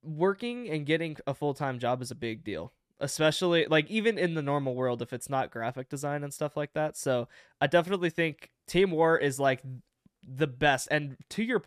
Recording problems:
none

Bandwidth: 14.5 kHz